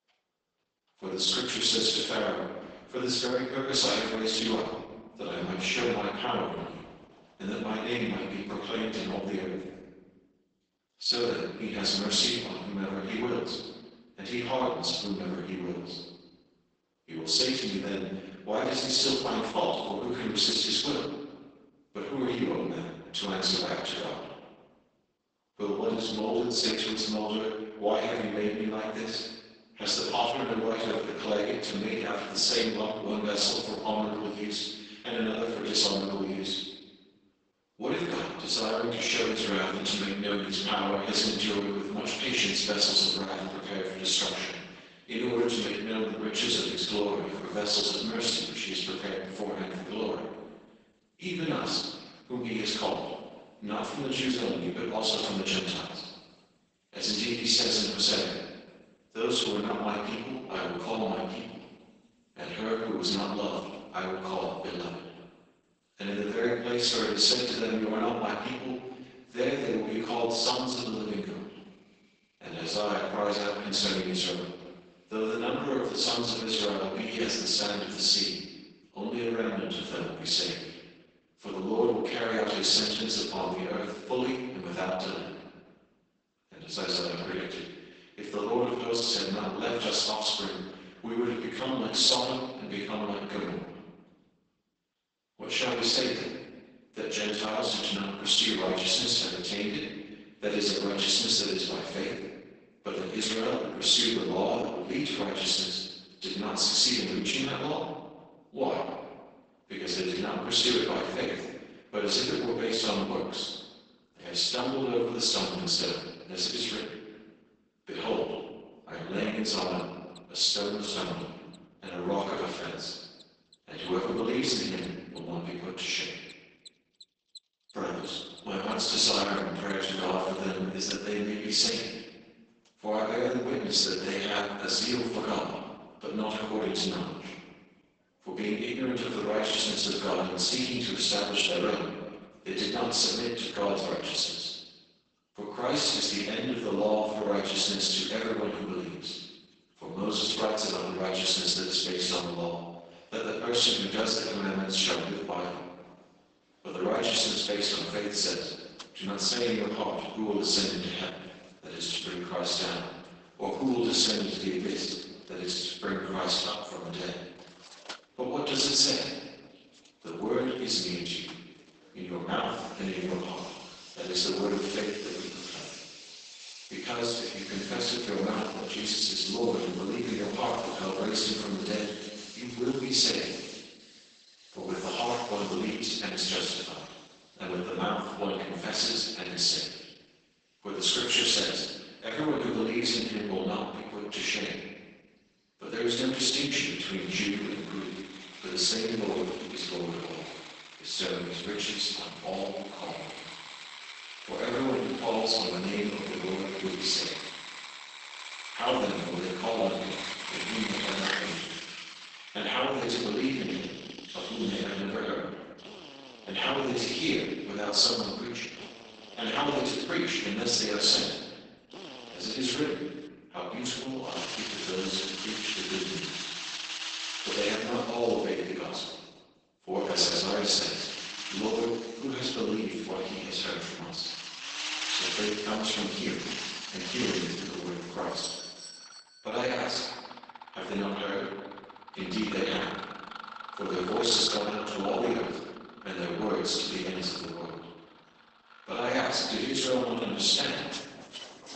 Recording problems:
room echo; strong; dies away in 1.1 s
off-mic speech; far
garbled, watery; badly; nothing above 8 kHz
thin; somewhat; fading below 250 Hz
machinery noise; noticeable; throughout; 10 dB below the speech
doorbell; noticeable; from 3:58 to 3:59; peak 8 dB below the speech

